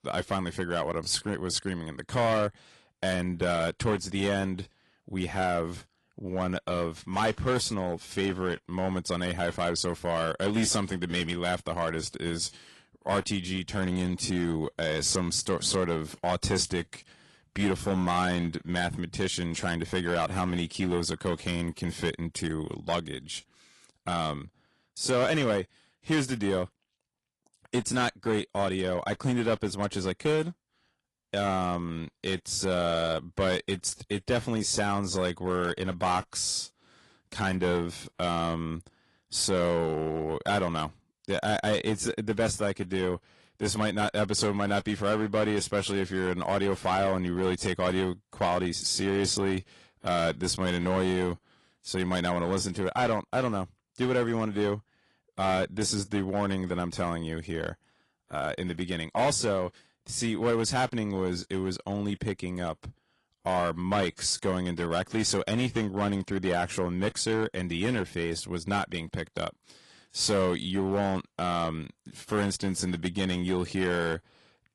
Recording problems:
distortion; slight; 4% of the sound clipped
garbled, watery; slightly

